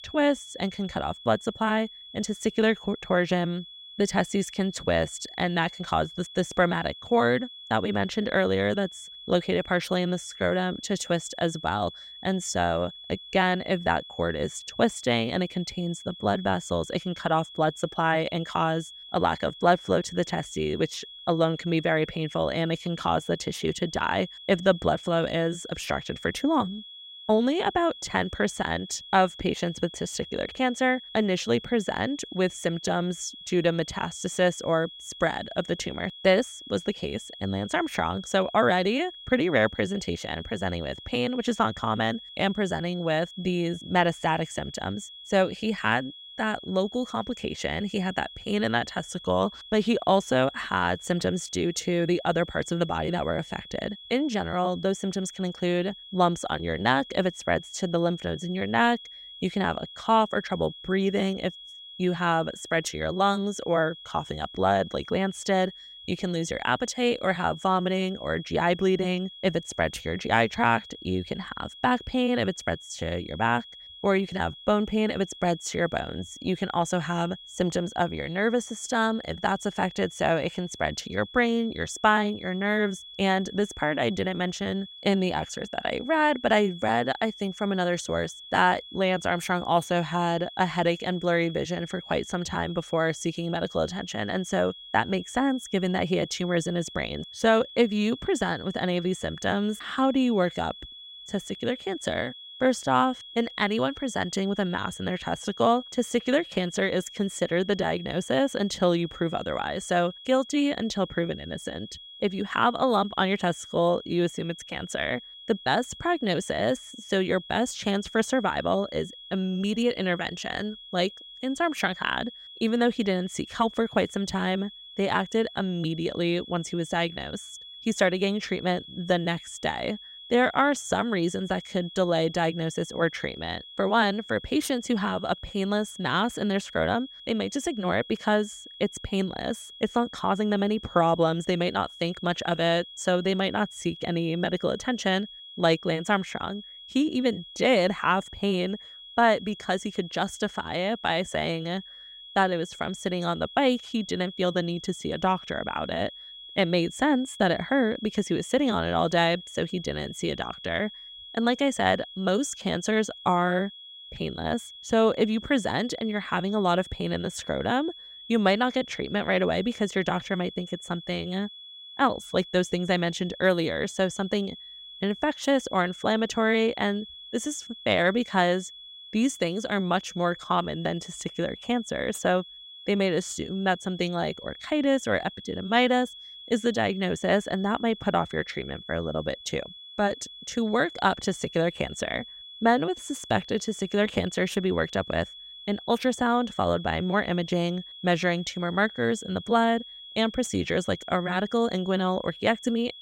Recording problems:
high-pitched whine; noticeable; throughout; 3.5 kHz, 15 dB below the speech

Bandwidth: 16 kHz